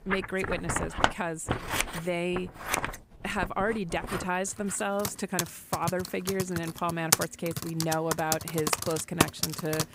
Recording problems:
household noises; very loud; throughout; as loud as the speech

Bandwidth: 15.5 kHz